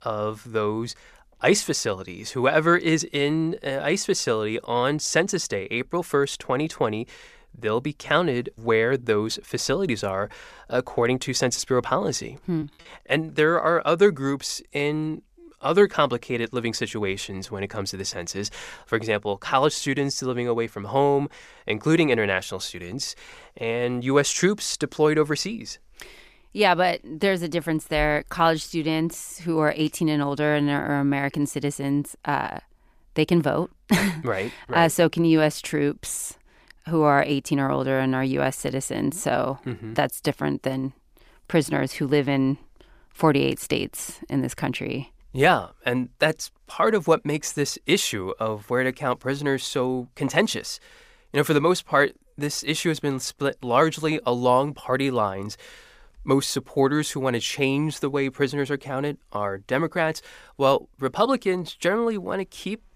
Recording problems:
choppy; very; at 13 s; 7% of the speech affected

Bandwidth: 15 kHz